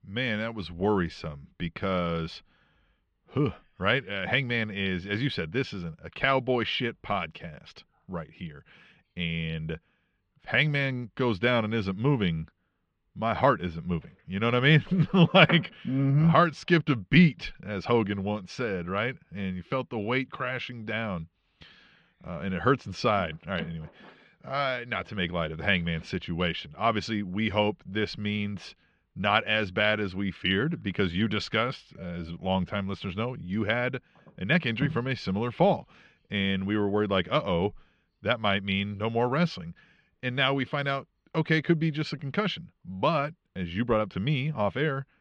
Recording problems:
muffled; slightly; fading above 3.5 kHz

